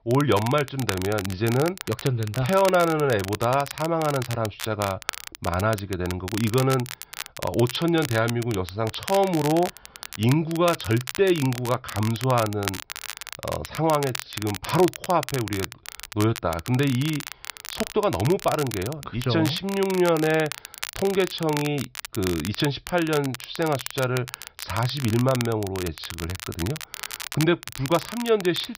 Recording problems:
high frequencies cut off; noticeable; nothing above 5.5 kHz
crackle, like an old record; noticeable; 10 dB below the speech

